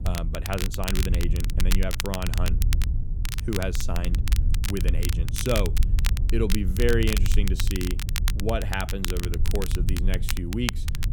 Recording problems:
crackle, like an old record; loud; 4 dB below the speech
low rumble; noticeable; throughout; 15 dB below the speech

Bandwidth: 18 kHz